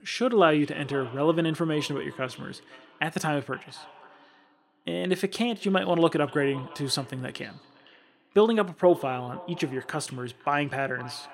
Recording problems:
echo of what is said; faint; throughout; 510 ms later, 20 dB below the speech

